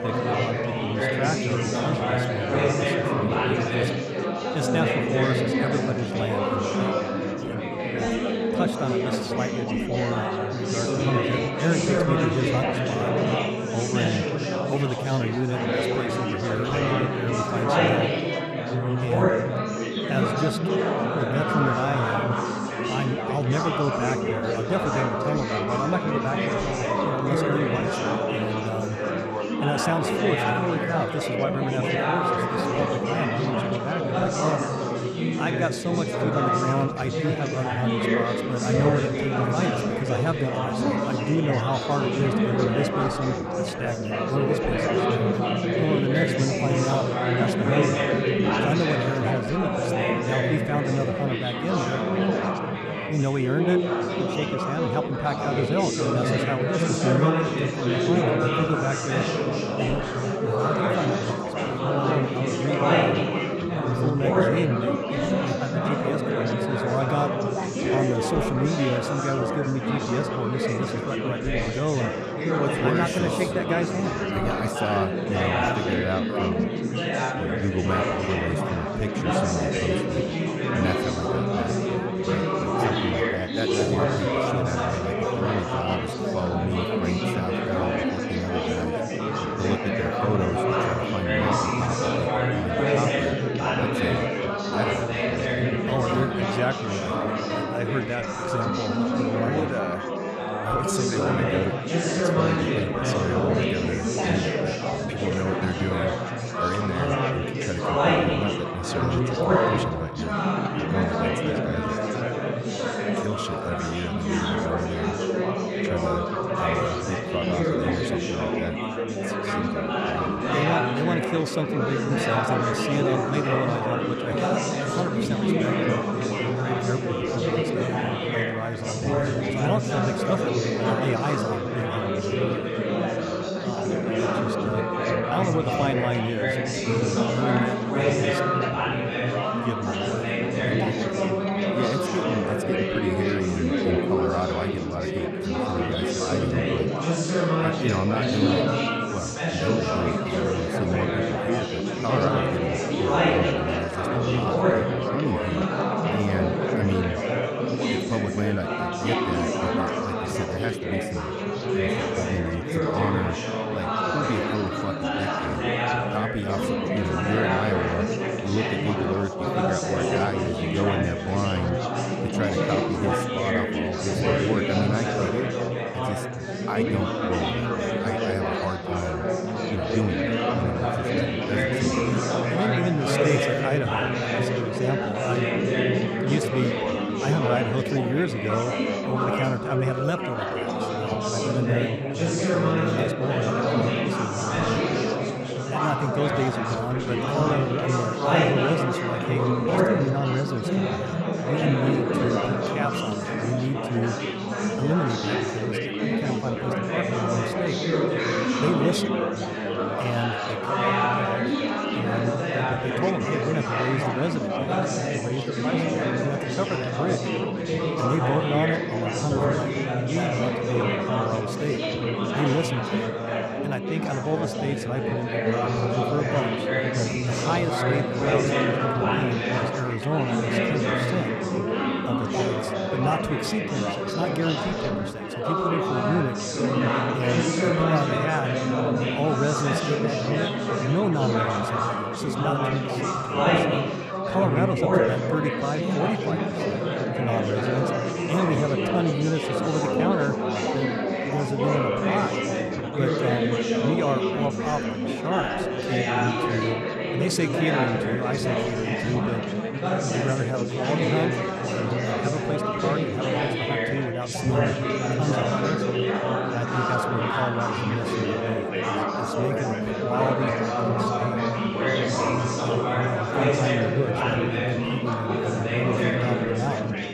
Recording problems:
chatter from many people; very loud; throughout; 4 dB above the speech

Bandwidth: 14.5 kHz